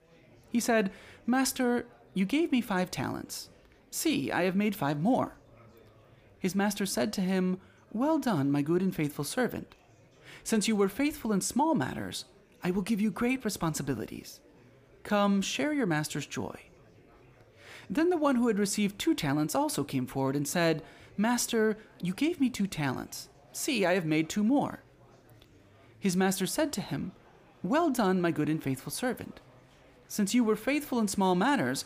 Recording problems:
murmuring crowd; faint; throughout; 30 dB below the speech

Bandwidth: 15 kHz